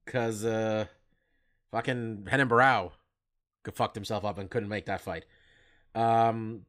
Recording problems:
none

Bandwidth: 15.5 kHz